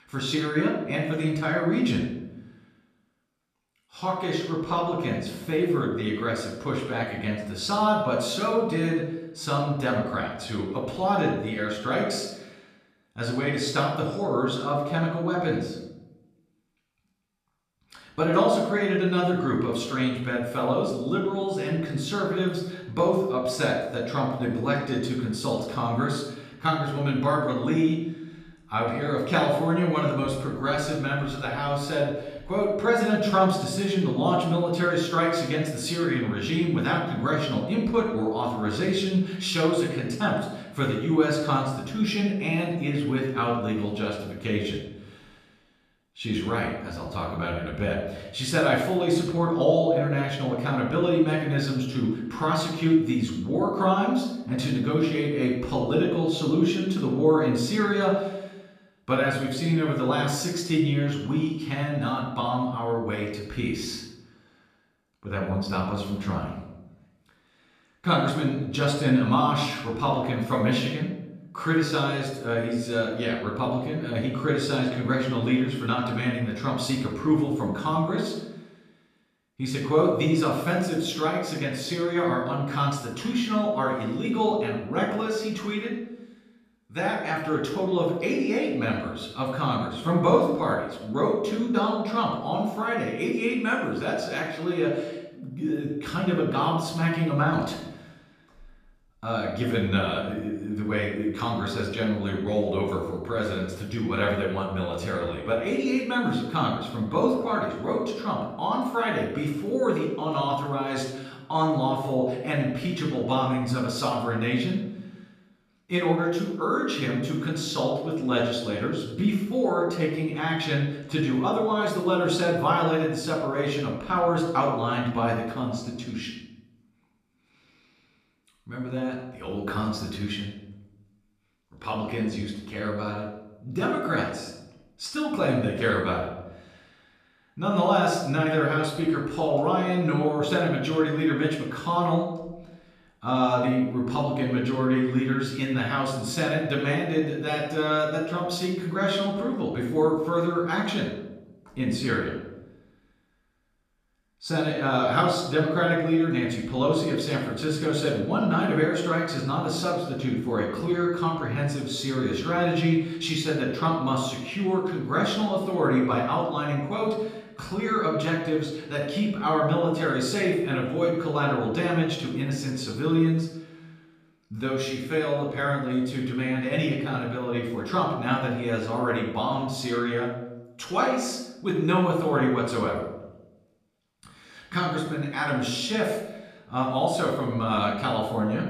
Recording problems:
off-mic speech; far
room echo; noticeable; dies away in 0.8 s

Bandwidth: 14.5 kHz